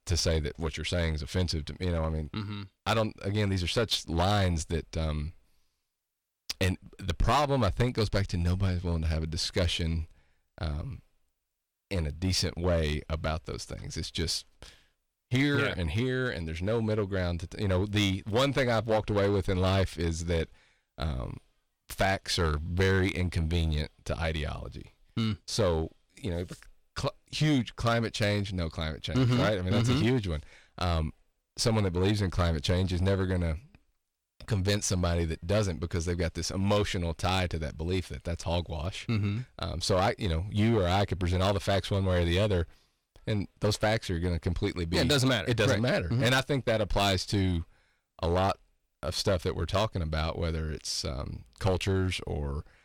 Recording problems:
distortion; slight; 5% of the sound clipped

